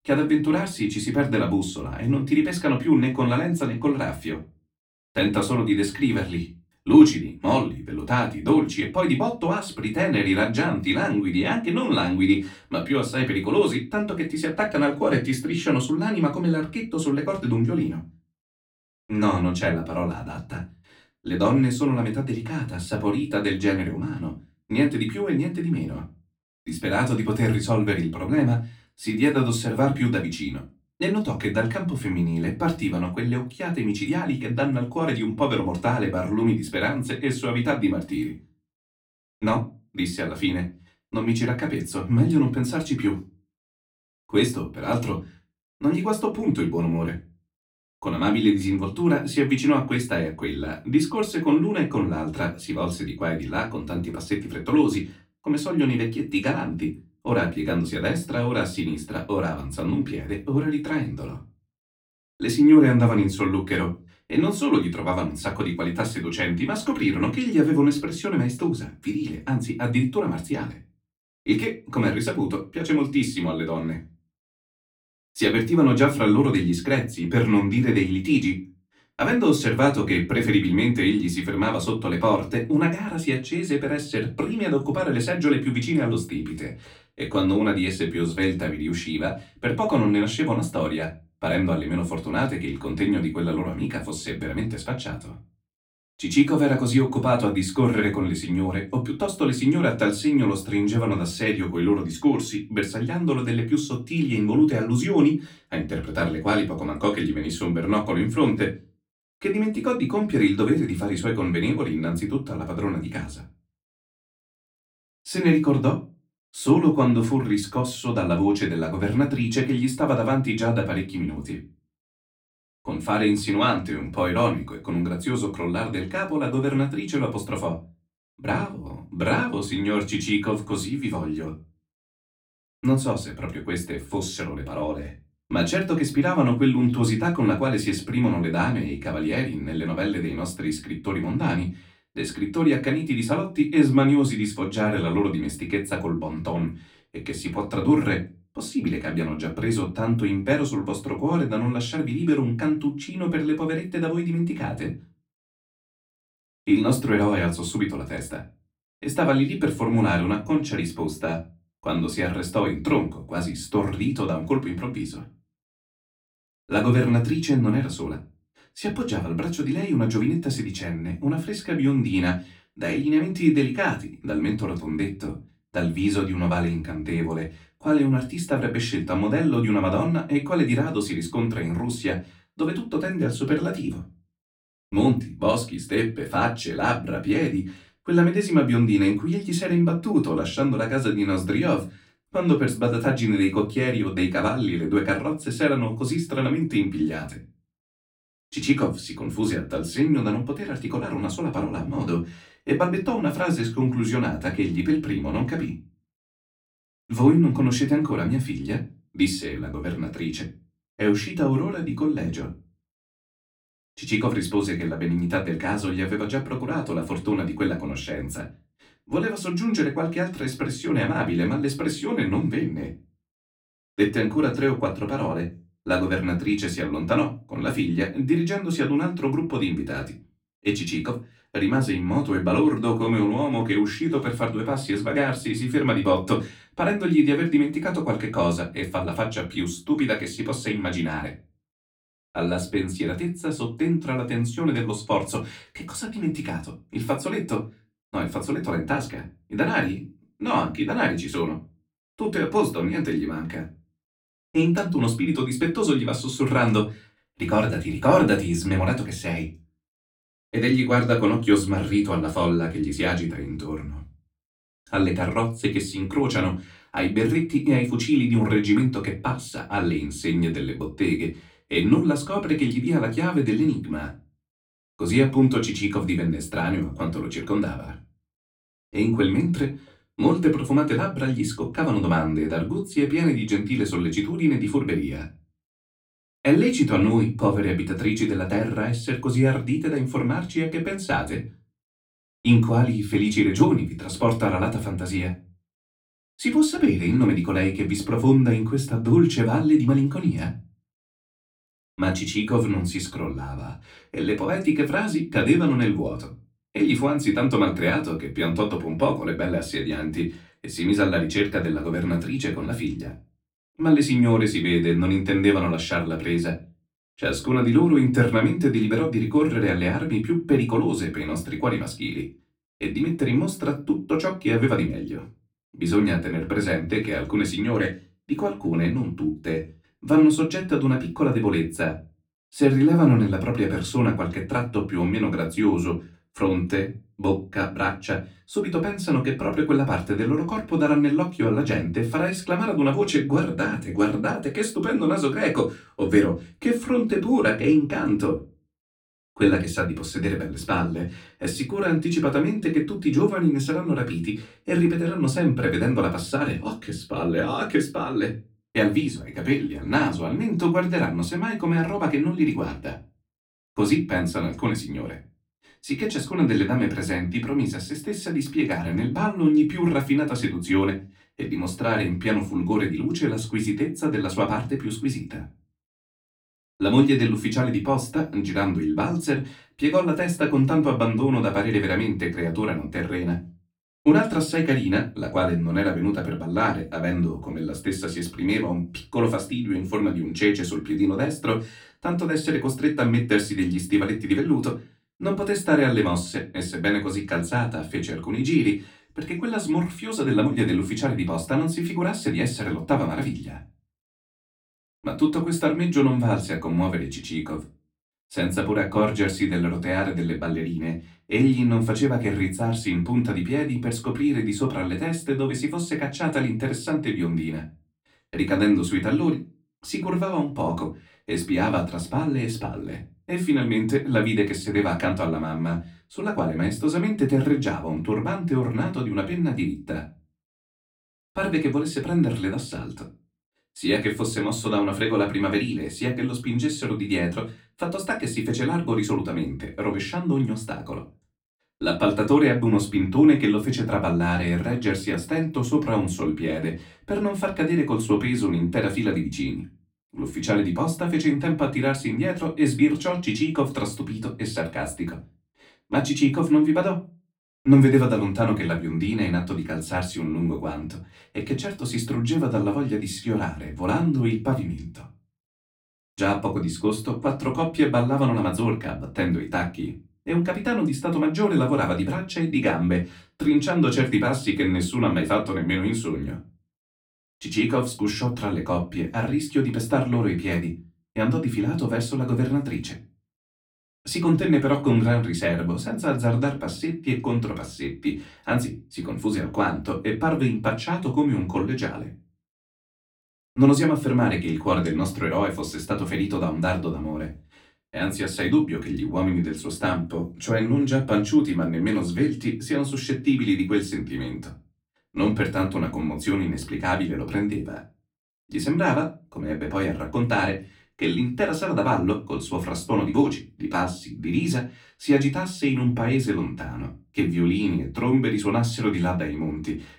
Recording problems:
off-mic speech; far
room echo; very slight; dies away in 0.3 s

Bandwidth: 17 kHz